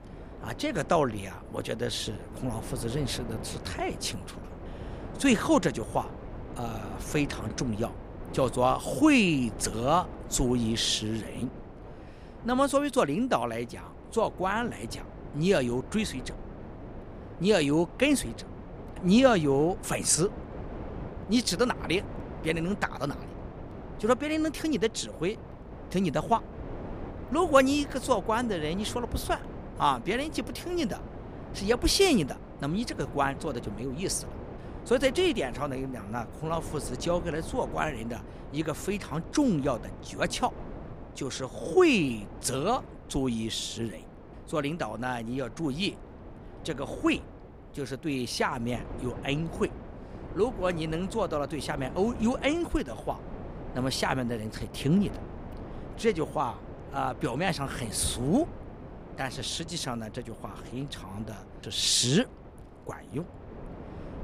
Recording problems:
wind noise on the microphone; occasional gusts; 15 dB below the speech

